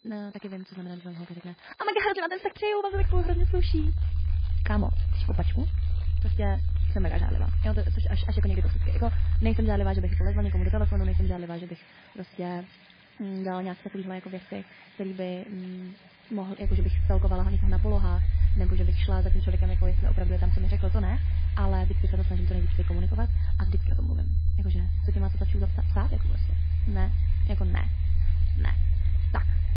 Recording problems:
garbled, watery; badly
wrong speed, natural pitch; too fast; 1.5 times normal speed
low rumble; loud; from 3 to 11 s and from 17 s on; 9 dB below the speech
household noises; noticeable; throughout; 20 dB below the speech
high-pitched whine; faint; until 10 s and from 18 s on; 4 kHz, 30 dB below the speech

